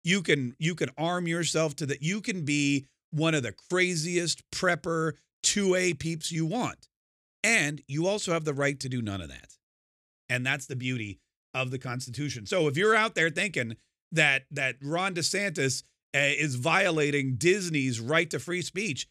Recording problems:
none

